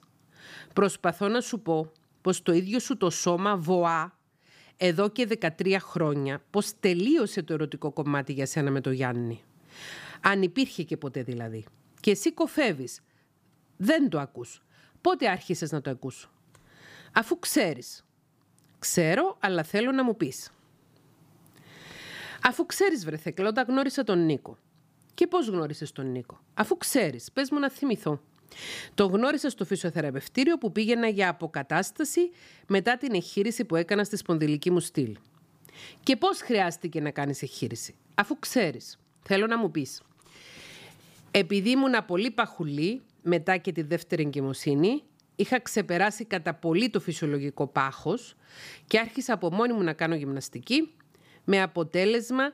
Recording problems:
none

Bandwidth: 15 kHz